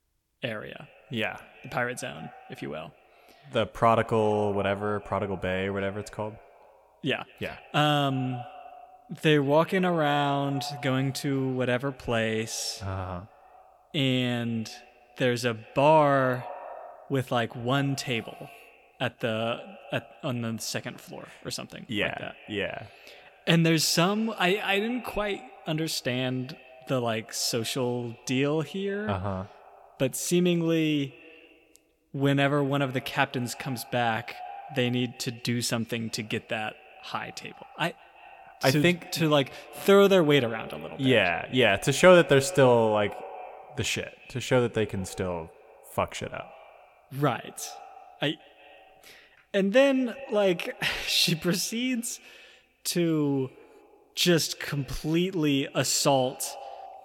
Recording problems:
echo of what is said; faint; throughout; 170 ms later, 20 dB below the speech

